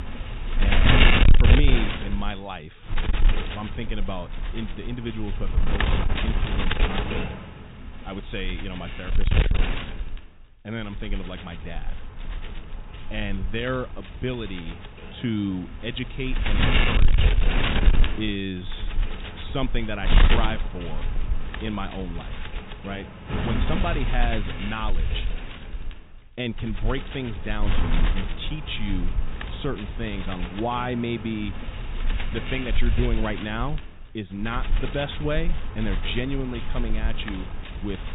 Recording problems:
high frequencies cut off; severe; nothing above 4 kHz
wind noise on the microphone; heavy; 2 dB above the speech

